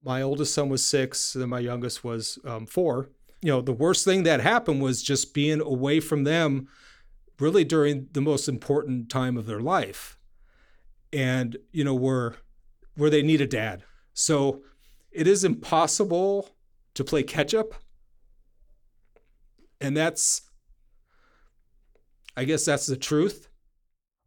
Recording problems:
none

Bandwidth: 18.5 kHz